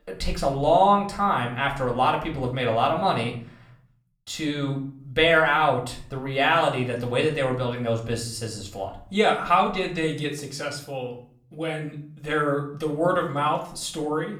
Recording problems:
room echo; slight; dies away in 0.5 s
off-mic speech; somewhat distant

